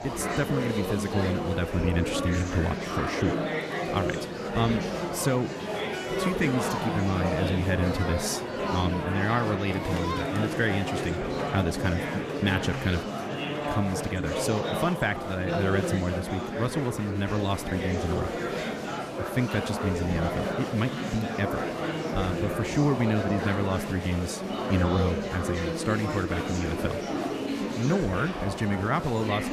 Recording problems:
murmuring crowd; loud; throughout; 2 dB below the speech

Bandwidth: 14.5 kHz